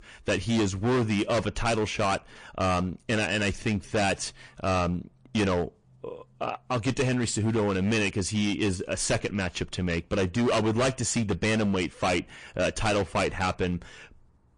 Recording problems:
distortion; heavy; 14% of the sound clipped
garbled, watery; slightly; nothing above 9.5 kHz

